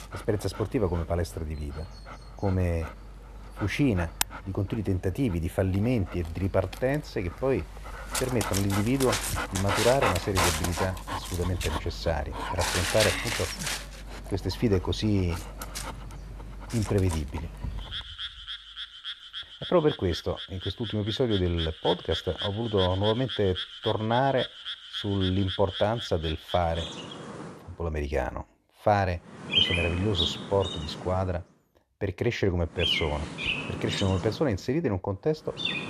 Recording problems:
animal sounds; loud; throughout; 4 dB below the speech

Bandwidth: 13.5 kHz